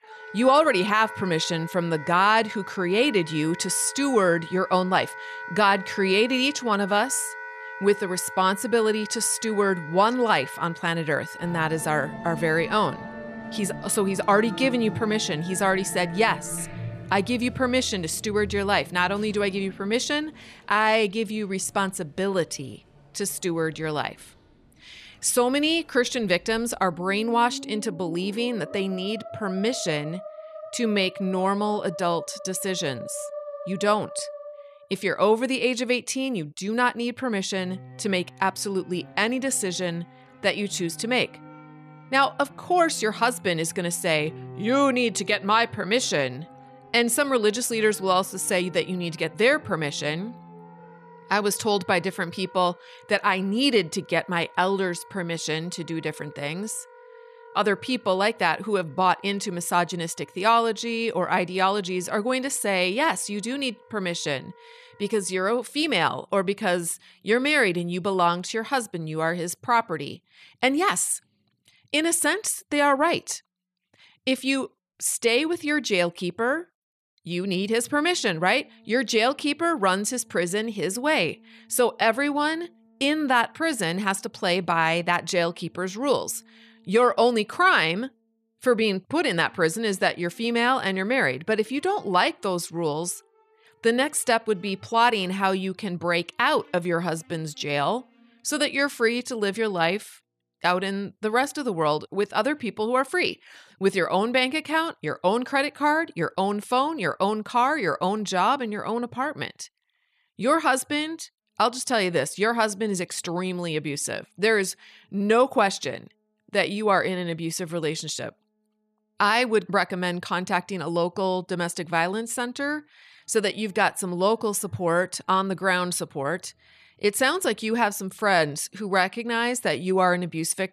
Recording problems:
background music; noticeable; throughout; 15 dB below the speech

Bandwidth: 13.5 kHz